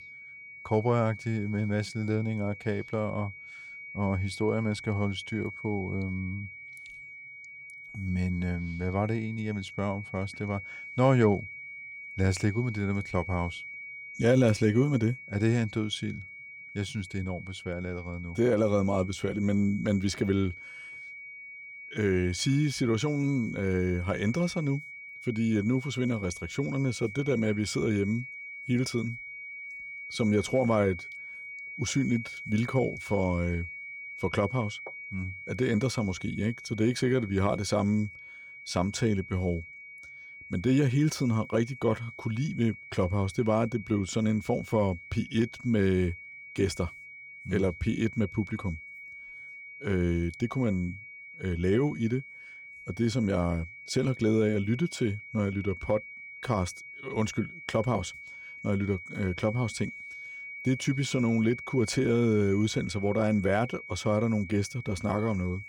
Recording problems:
high-pitched whine; noticeable; throughout; 2.5 kHz, 10 dB below the speech

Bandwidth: 17 kHz